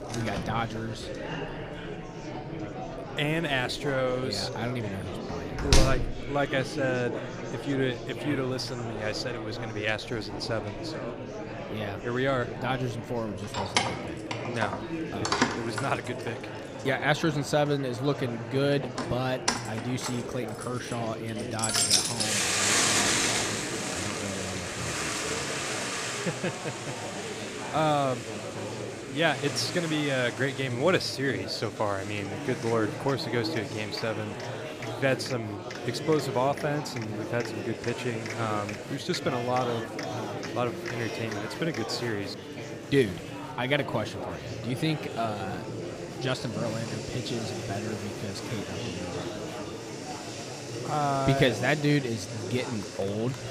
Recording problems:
household noises; loud; throughout; as loud as the speech
murmuring crowd; loud; throughout; 6 dB below the speech

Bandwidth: 15 kHz